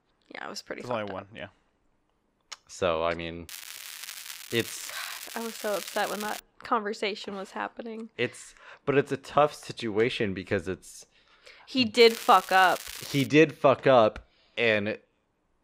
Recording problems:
crackling; noticeable; from 3.5 to 6.5 s and from 12 to 13 s; 15 dB below the speech

